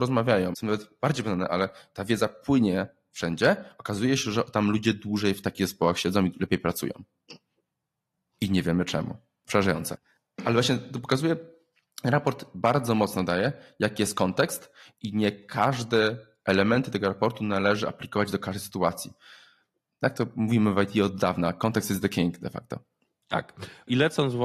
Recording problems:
garbled, watery; slightly; nothing above 13.5 kHz
abrupt cut into speech; at the start and the end

